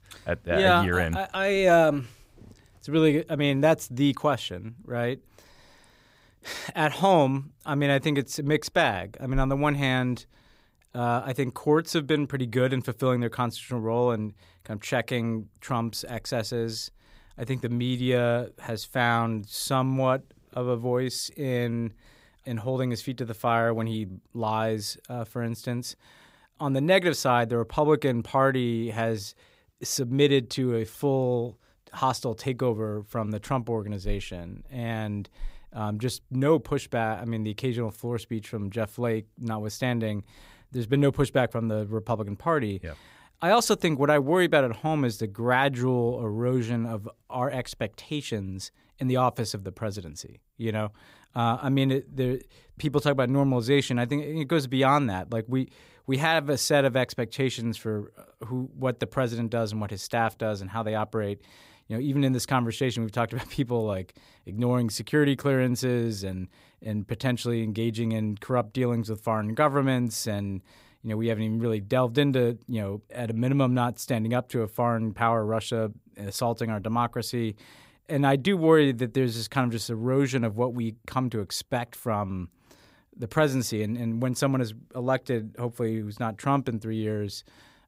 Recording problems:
none

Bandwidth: 15.5 kHz